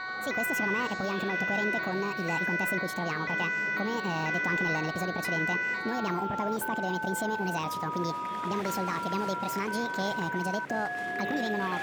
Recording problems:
wrong speed and pitch; too fast and too high; 1.6 times normal speed
alarms or sirens; very loud; throughout; 2 dB above the speech
murmuring crowd; loud; throughout; 9 dB below the speech

